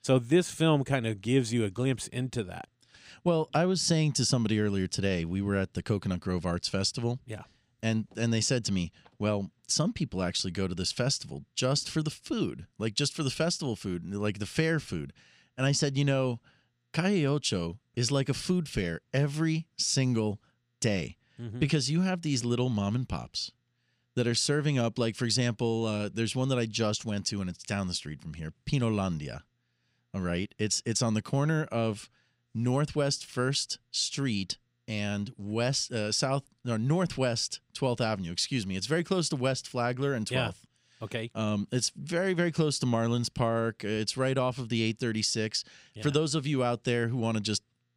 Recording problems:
none

